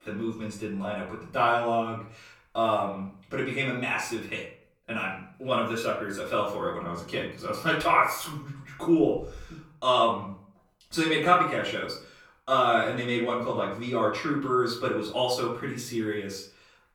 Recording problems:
off-mic speech; far
room echo; slight; dies away in 0.4 s

